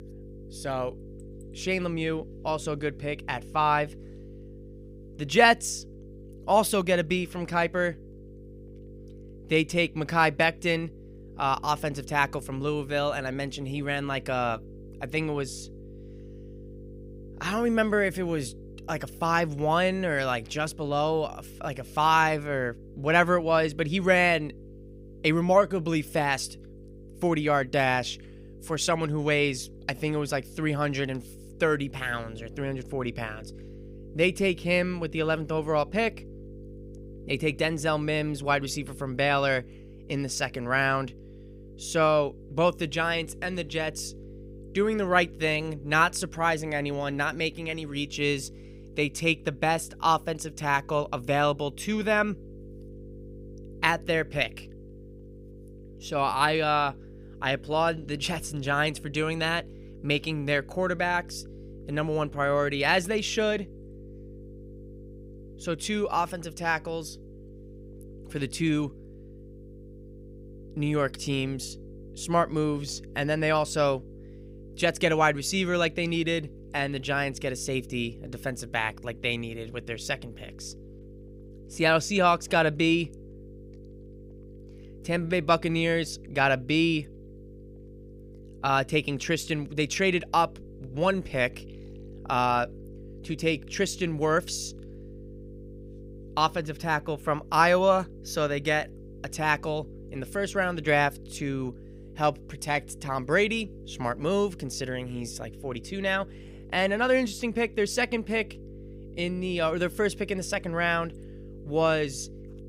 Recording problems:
electrical hum; faint; throughout; 50 Hz, 25 dB below the speech

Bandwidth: 15.5 kHz